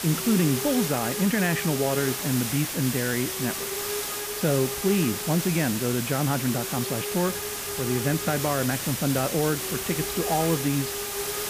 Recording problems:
muffled; slightly; fading above 3.5 kHz
hiss; loud; throughout; 2 dB below the speech
traffic noise; faint; throughout; 25 dB below the speech

